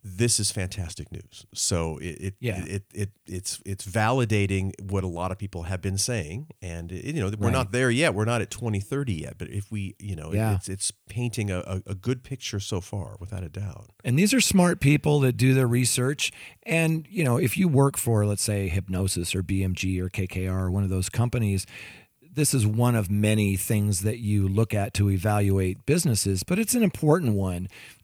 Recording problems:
none

